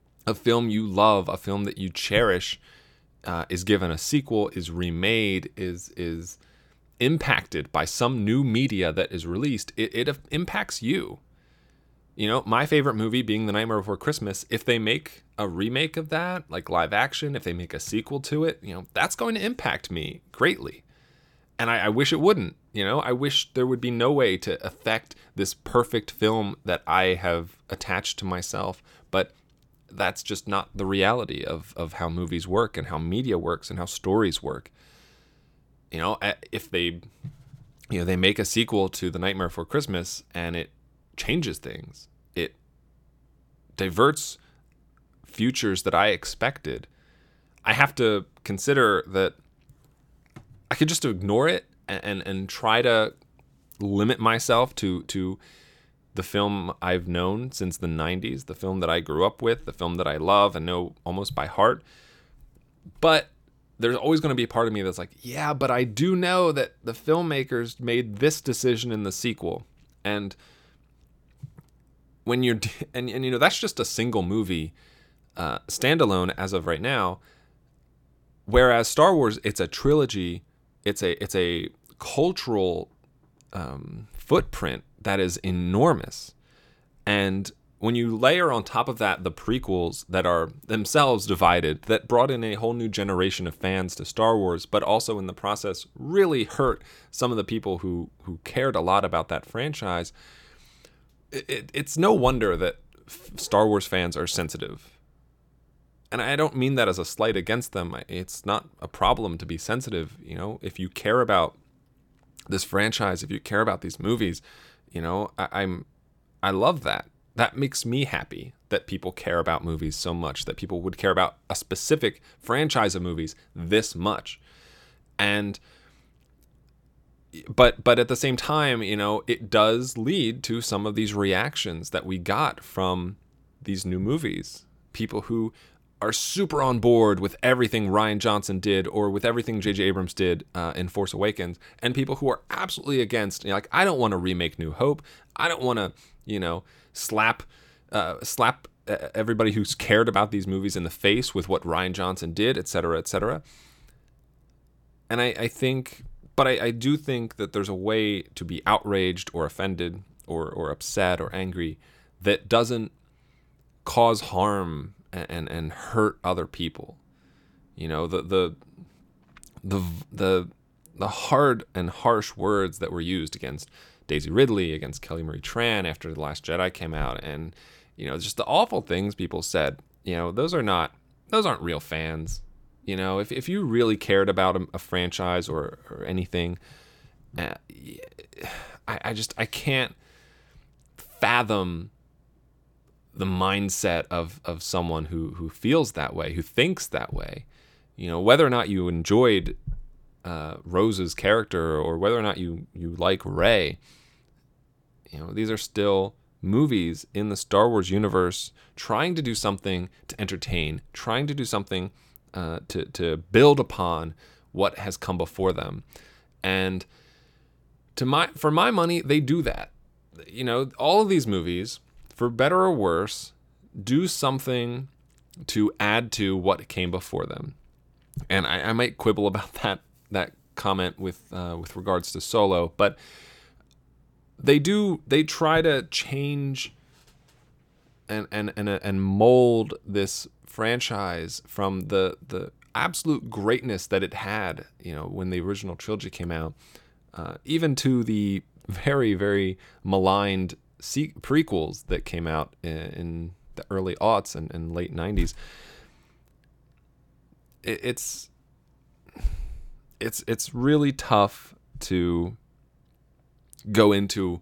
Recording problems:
none

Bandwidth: 17.5 kHz